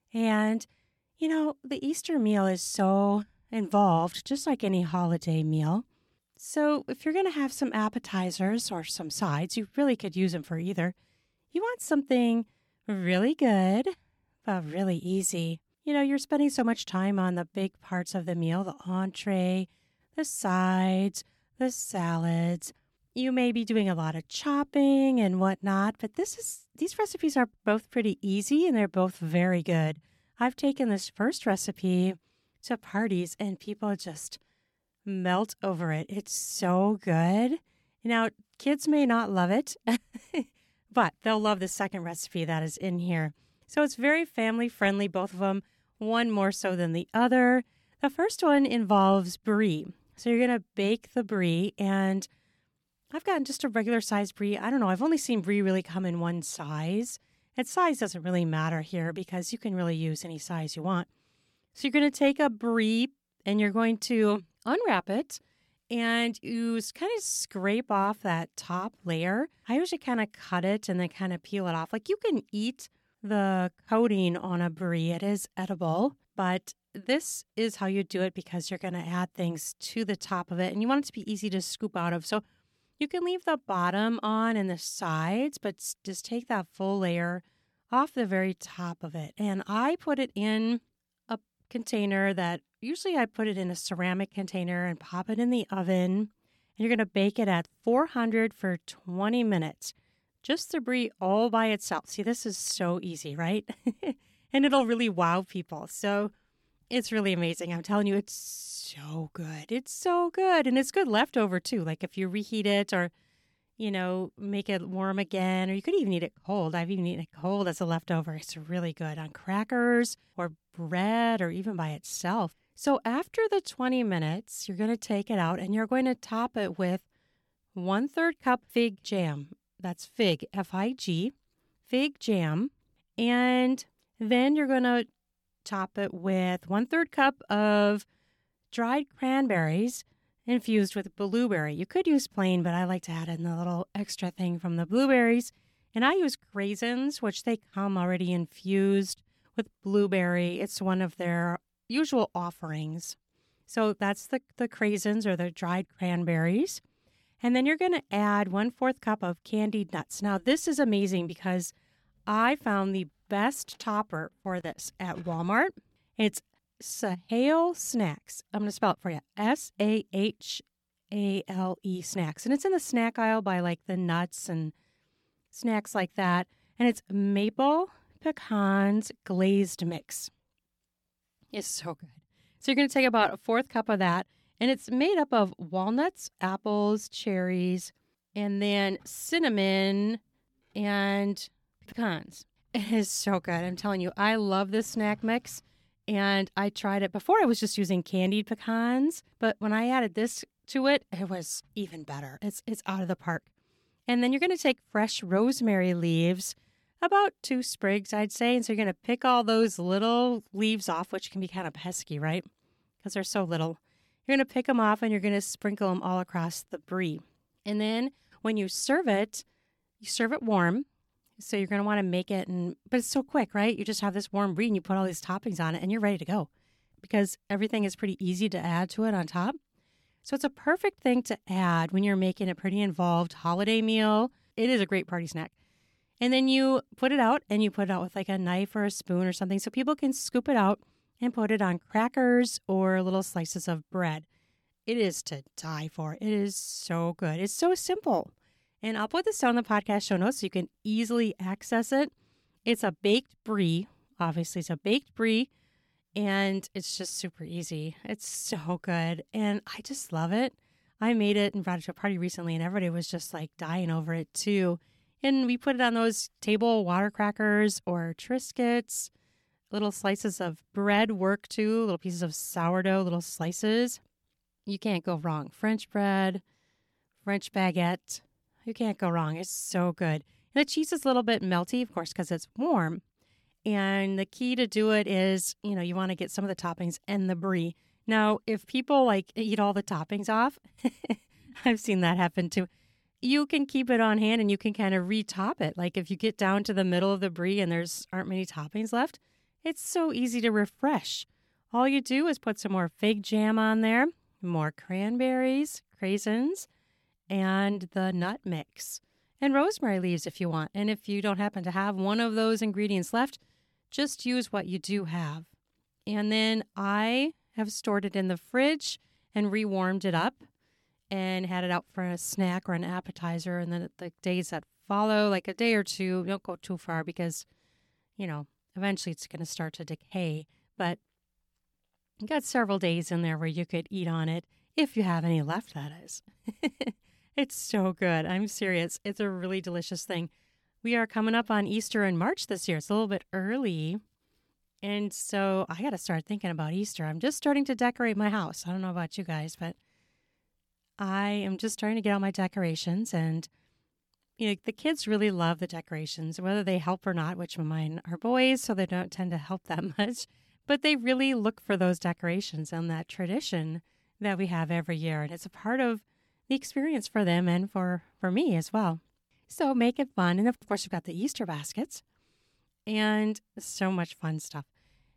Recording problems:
none

